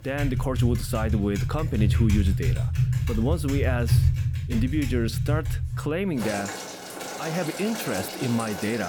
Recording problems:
household noises; very loud; throughout; 1 dB above the speech
abrupt cut into speech; at the end

